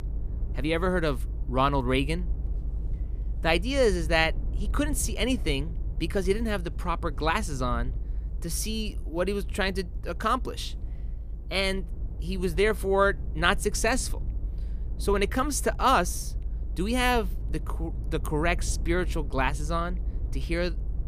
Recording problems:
low rumble; faint; throughout; 25 dB below the speech

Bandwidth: 14.5 kHz